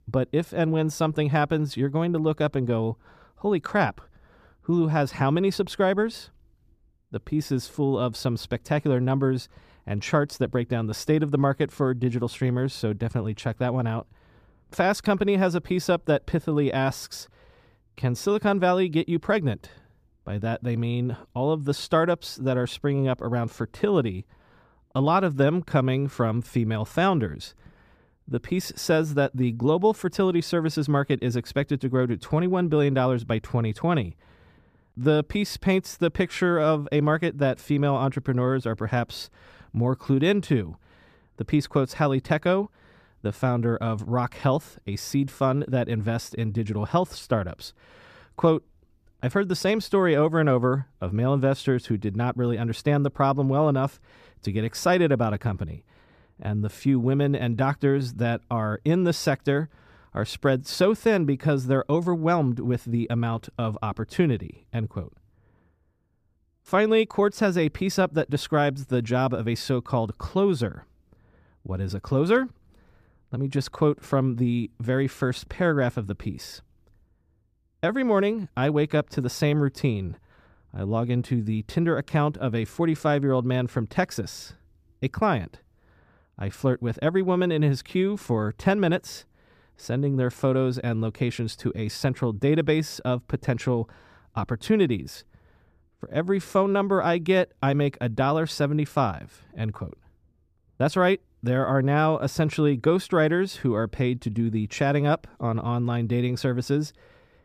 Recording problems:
none

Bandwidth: 14.5 kHz